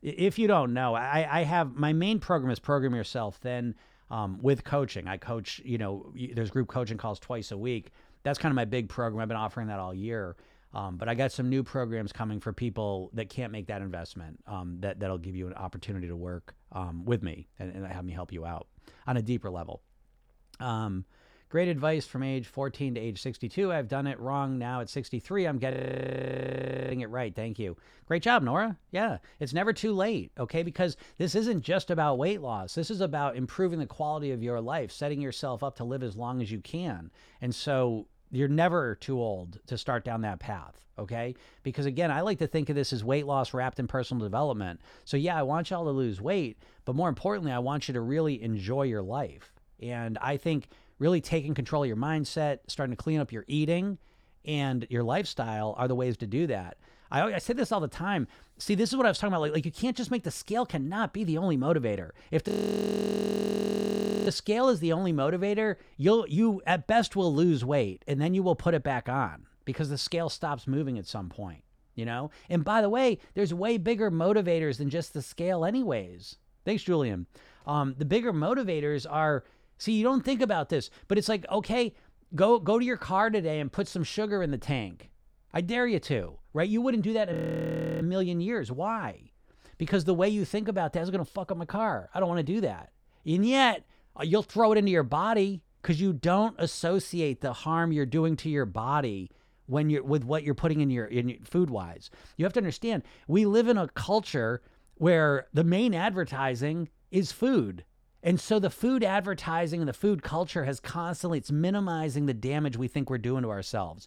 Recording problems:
audio freezing; at 26 s for 1 s, at 1:02 for 2 s and at 1:27 for 0.5 s

